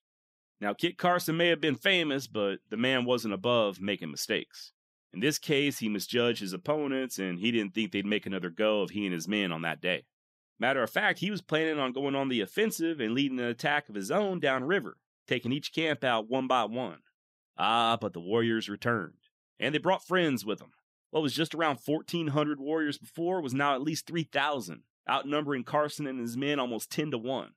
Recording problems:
none

